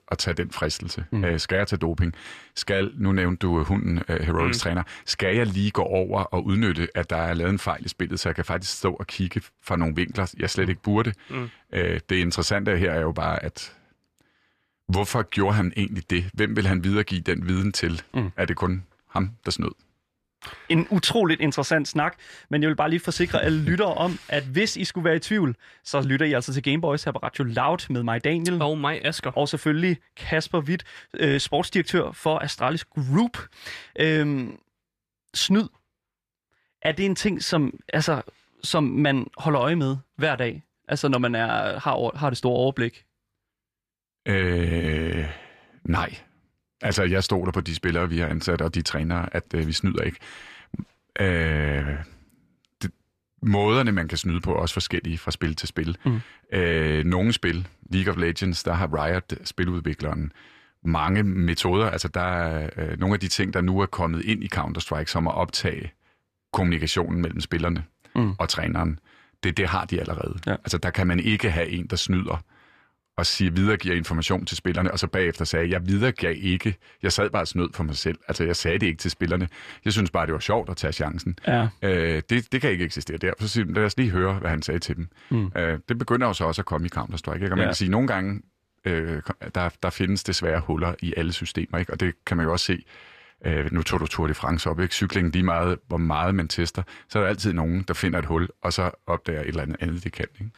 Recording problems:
none

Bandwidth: 14.5 kHz